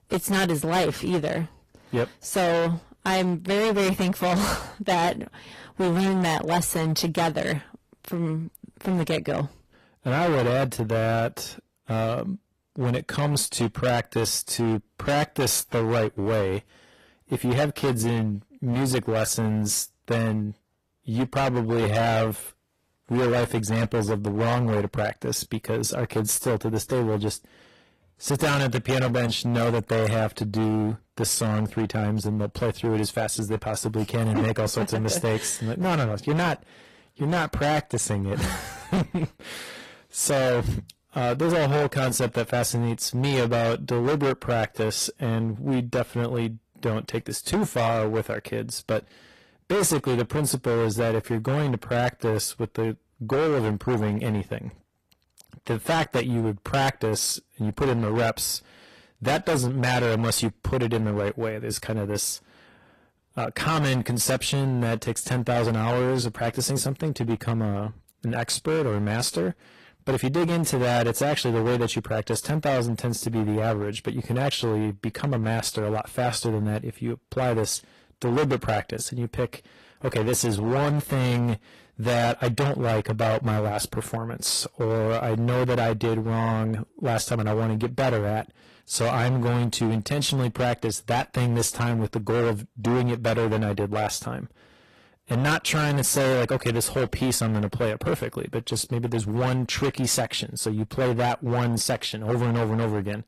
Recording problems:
distortion; heavy; 18% of the sound clipped
garbled, watery; slightly; nothing above 12.5 kHz

